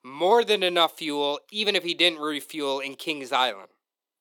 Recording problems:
thin; somewhat; fading below 400 Hz

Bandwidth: 18.5 kHz